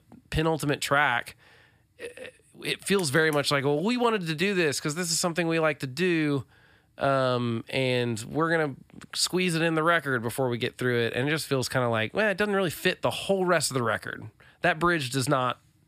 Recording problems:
none

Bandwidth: 15 kHz